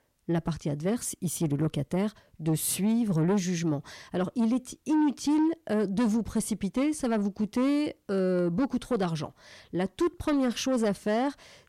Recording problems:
distortion; slight; 10 dB below the speech

